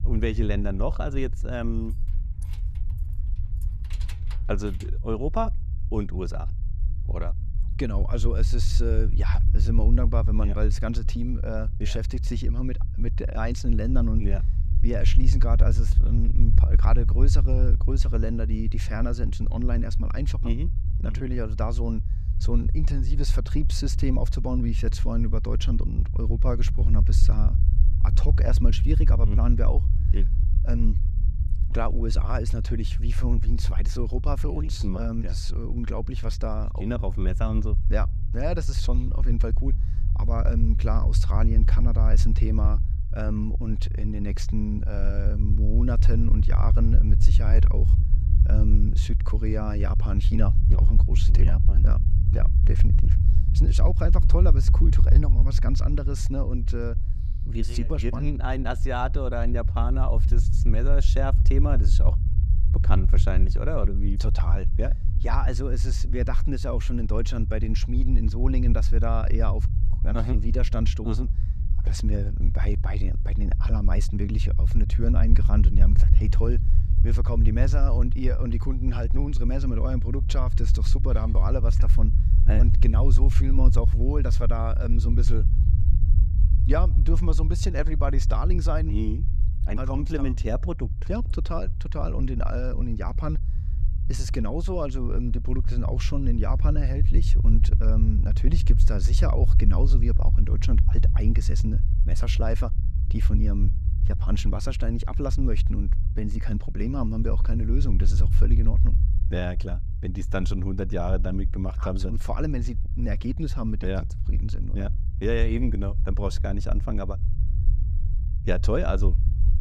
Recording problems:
low rumble; loud; throughout; 9 dB below the speech
jangling keys; faint; from 2 to 5 s; peak 15 dB below the speech

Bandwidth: 14.5 kHz